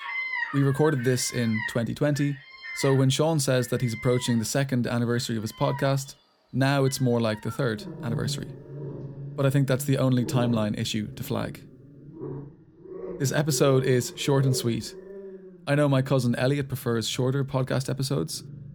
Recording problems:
animal sounds; noticeable; throughout; 10 dB below the speech

